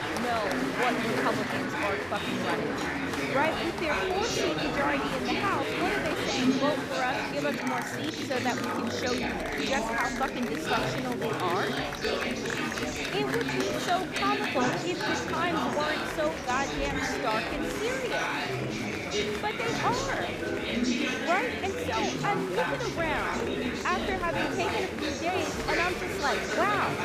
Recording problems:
chatter from many people; very loud; throughout; 2 dB above the speech

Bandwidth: 15 kHz